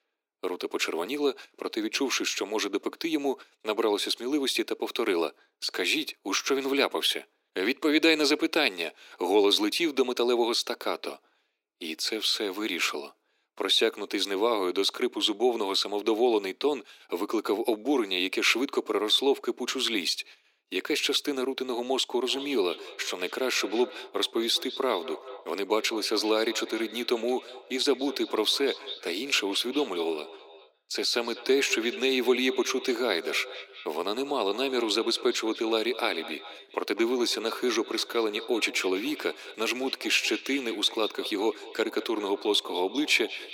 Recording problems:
thin; very; fading below 300 Hz
echo of what is said; noticeable; from 22 s on; 200 ms later, 15 dB below the speech

